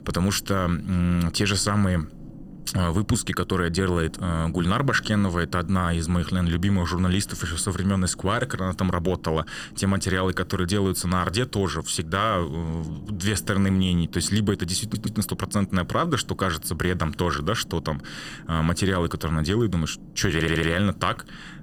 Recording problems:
low rumble; faint; throughout; 25 dB below the speech
audio stuttering; at 15 s and at 20 s

